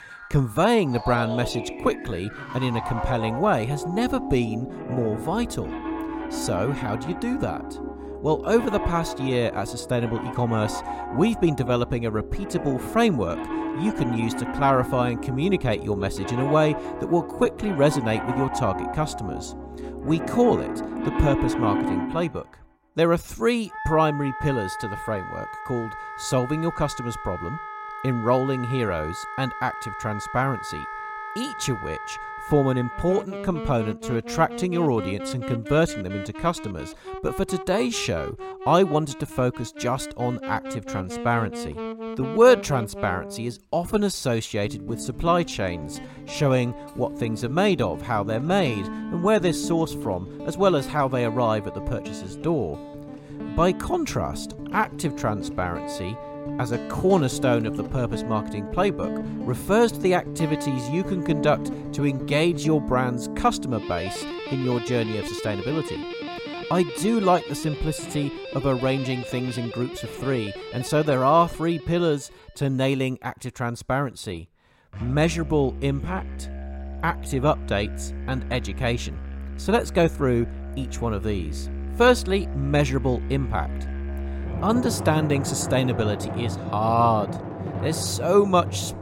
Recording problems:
background music; loud; throughout; 8 dB below the speech

